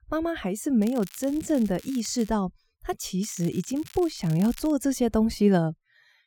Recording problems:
crackling; faint; from 1 to 2.5 s and from 3 to 4.5 s; 20 dB below the speech

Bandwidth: 17.5 kHz